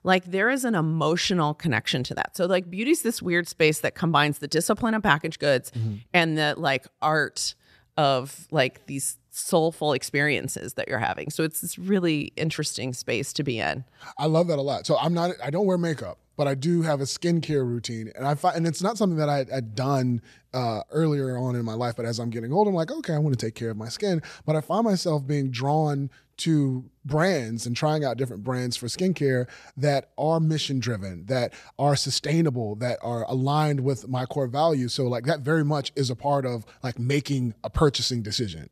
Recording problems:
none

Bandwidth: 14 kHz